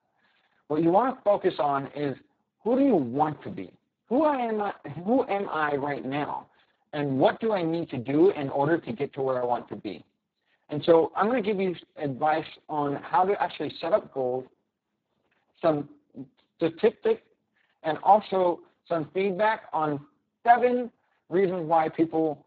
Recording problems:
garbled, watery; badly; nothing above 7.5 kHz

